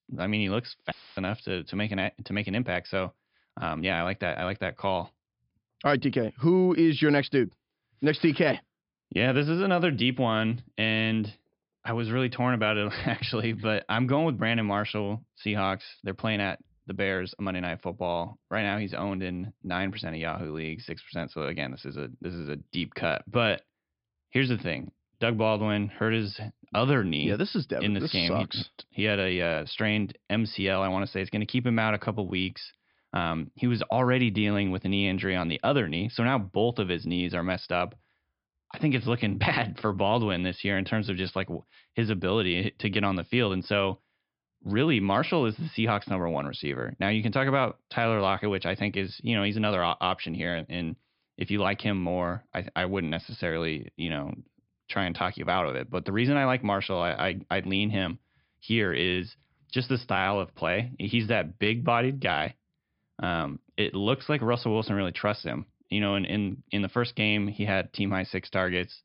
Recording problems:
high frequencies cut off; noticeable; nothing above 5.5 kHz
audio cutting out; filled with static; at 1 s

